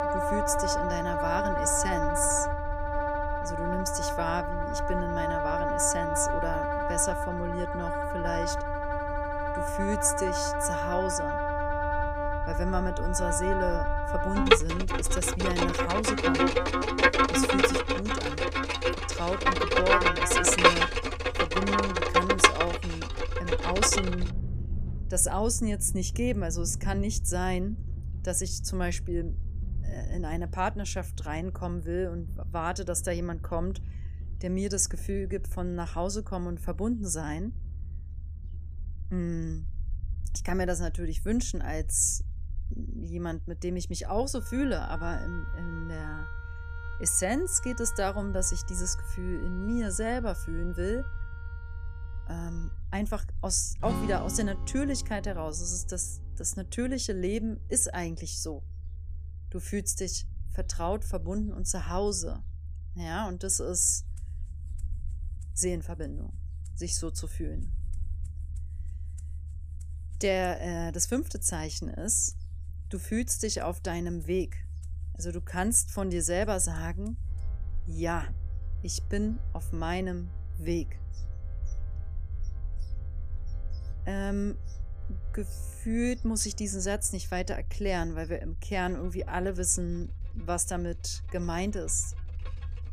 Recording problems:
background music; very loud; throughout; 3 dB above the speech
low rumble; faint; throughout; 25 dB below the speech

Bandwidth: 14.5 kHz